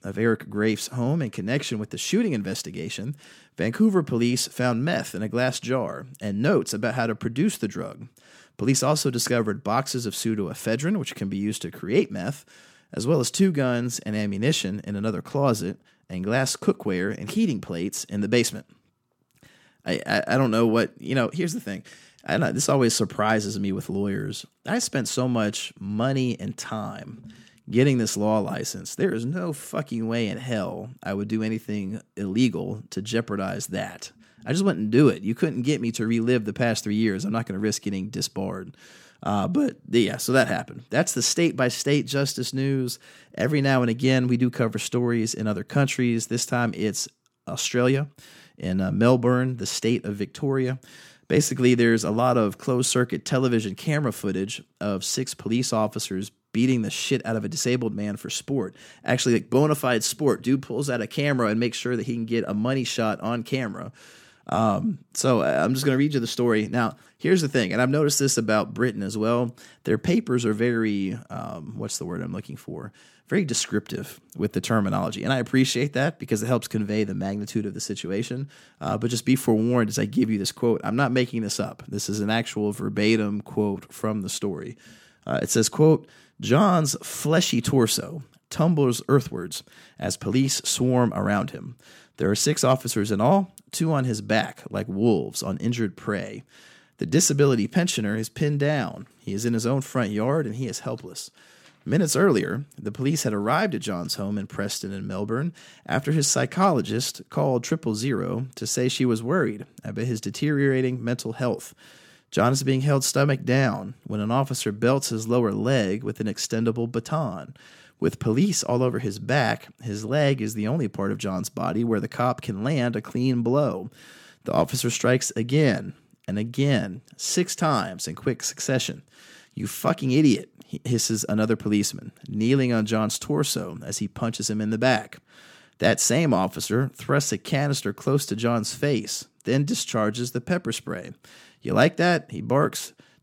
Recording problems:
none

